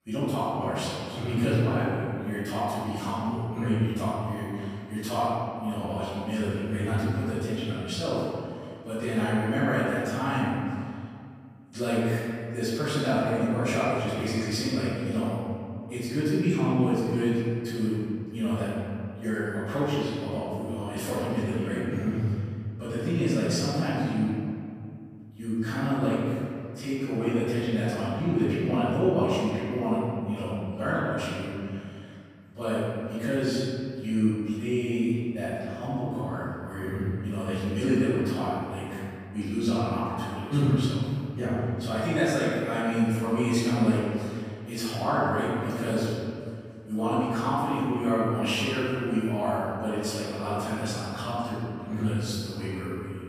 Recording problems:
room echo; strong; dies away in 2.1 s
off-mic speech; far

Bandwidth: 15 kHz